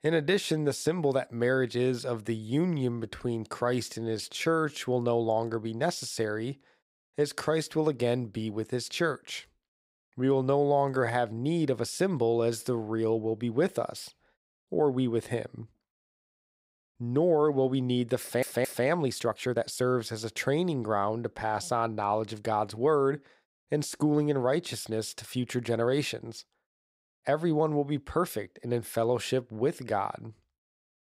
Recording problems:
uneven, jittery; strongly; from 2.5 to 29 s
audio stuttering; at 18 s

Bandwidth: 15.5 kHz